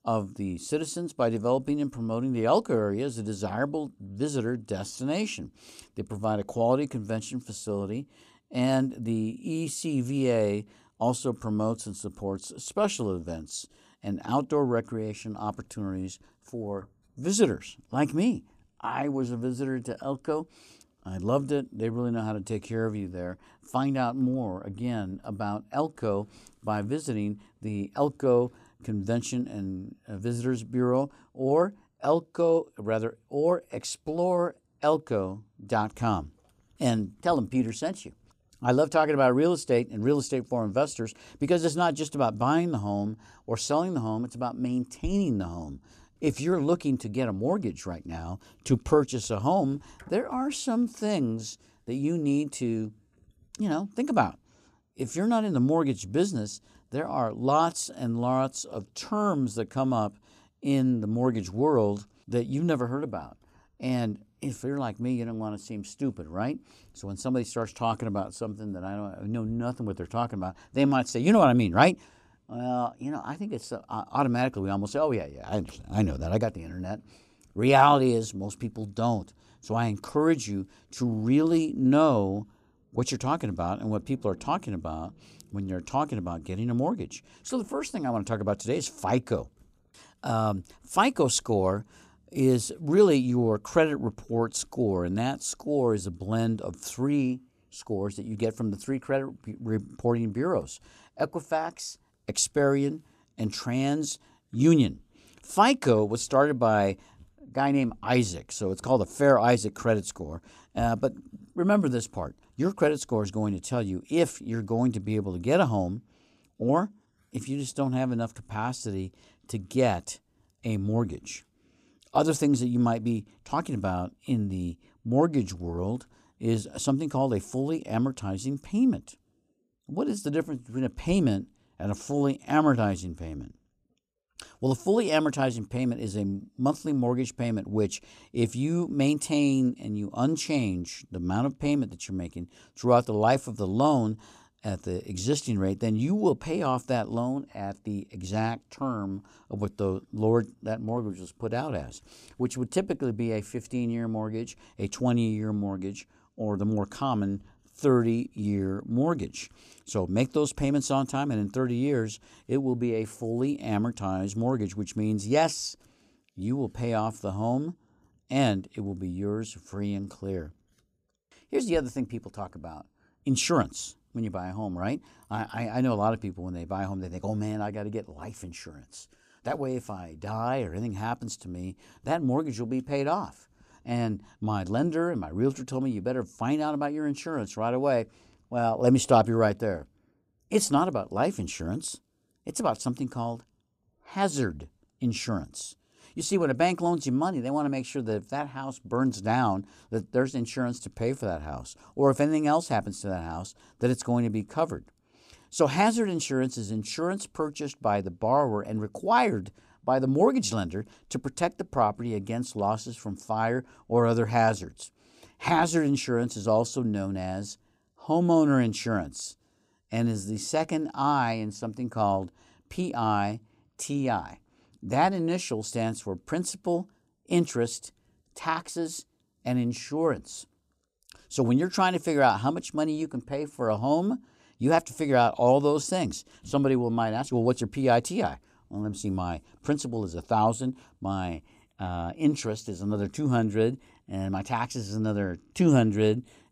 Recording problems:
none

